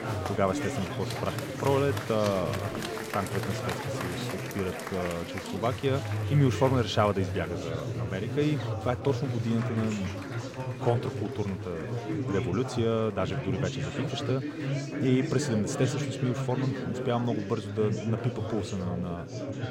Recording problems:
chatter from many people; loud; throughout; 3 dB below the speech

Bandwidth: 16 kHz